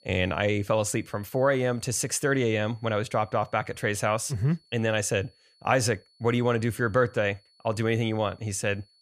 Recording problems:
high-pitched whine; faint; throughout; 4.5 kHz, 35 dB below the speech

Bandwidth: 15 kHz